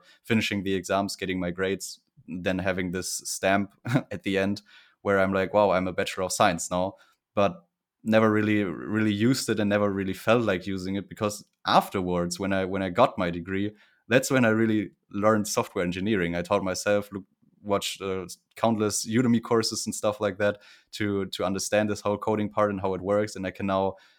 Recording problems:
none

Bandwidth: 18.5 kHz